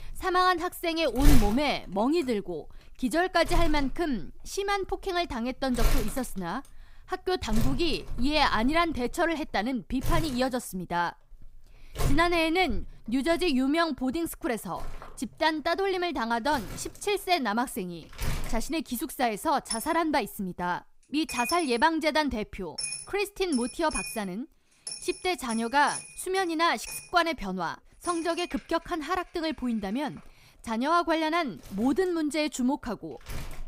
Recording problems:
household noises; loud; throughout; 8 dB below the speech

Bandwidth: 15.5 kHz